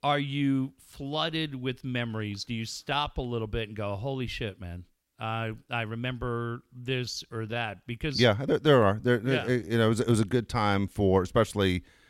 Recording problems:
uneven, jittery; strongly; from 1 to 9.5 s

